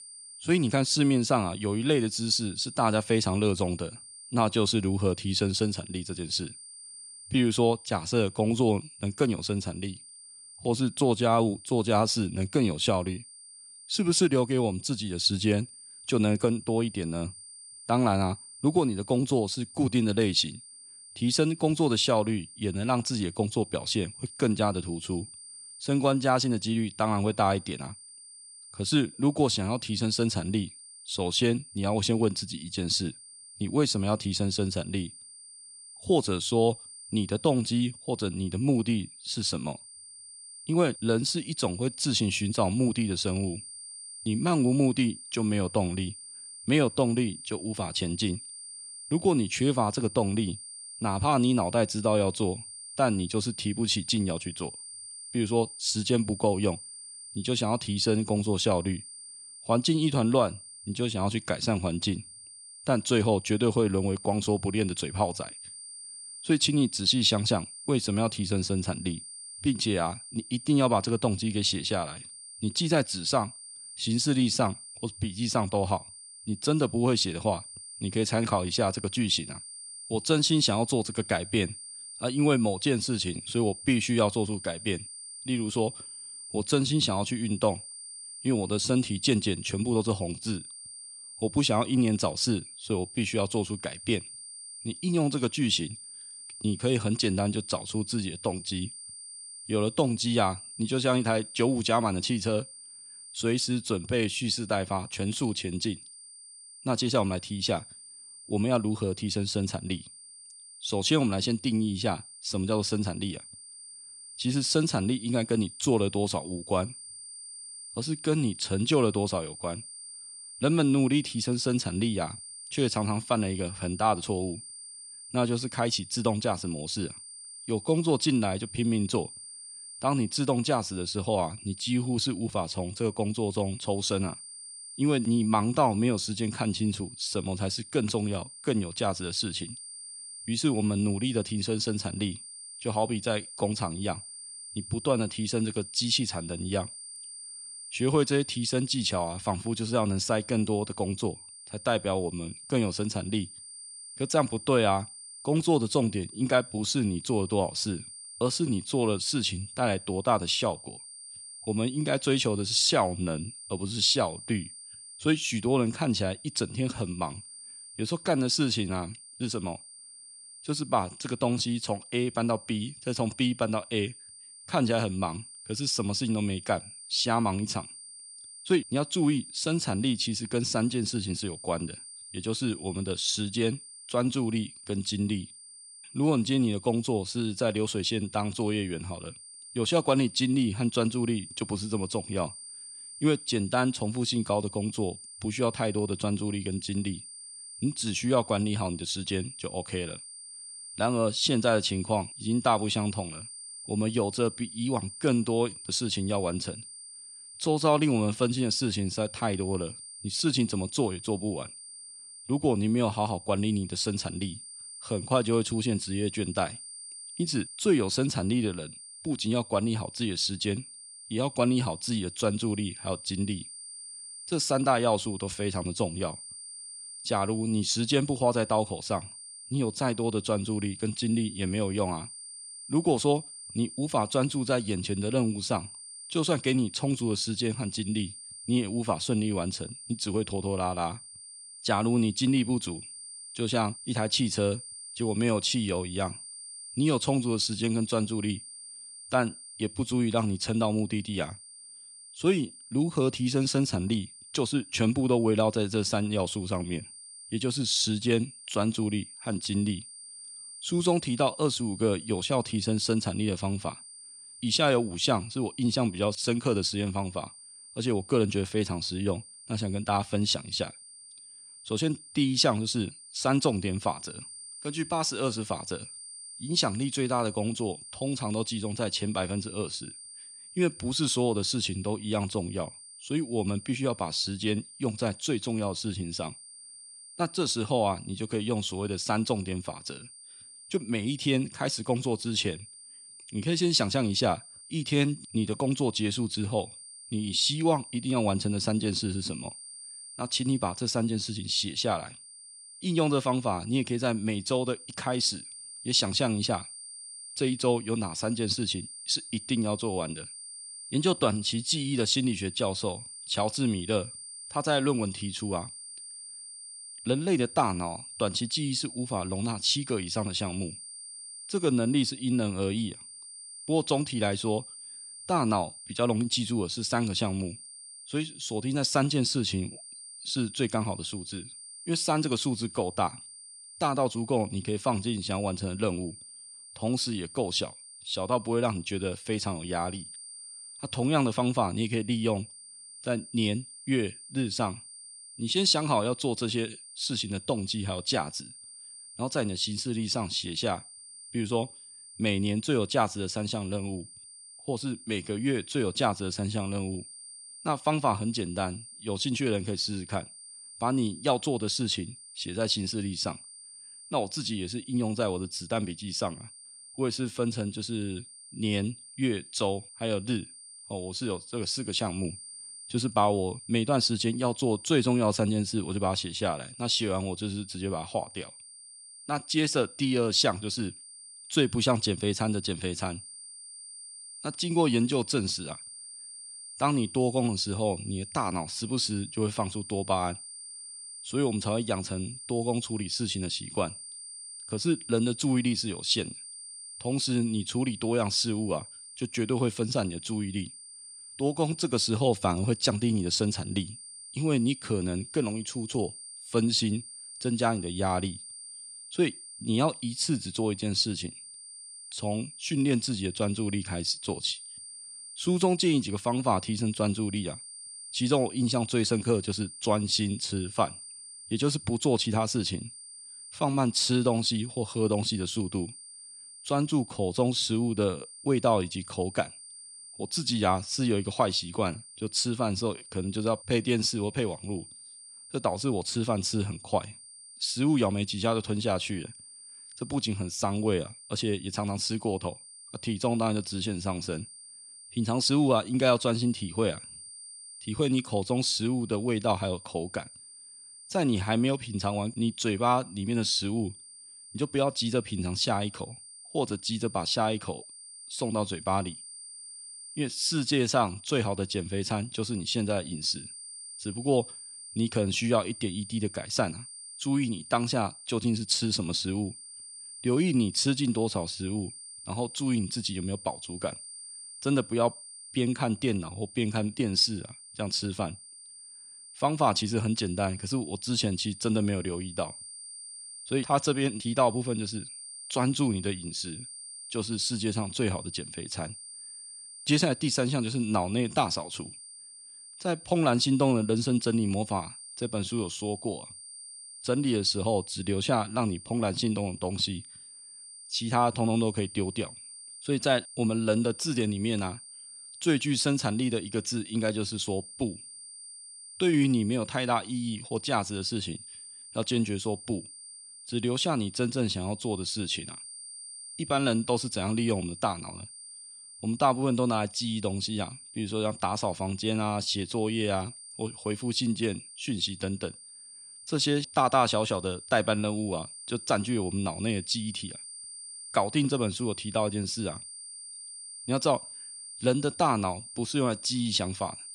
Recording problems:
high-pitched whine; noticeable; throughout; 9 kHz, 15 dB below the speech

